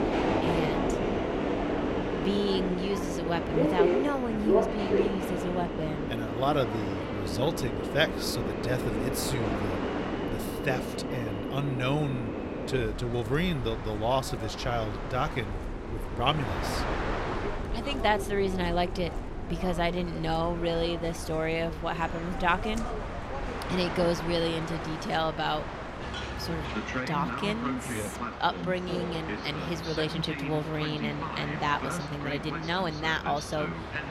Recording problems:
train or aircraft noise; loud; throughout; 1 dB below the speech

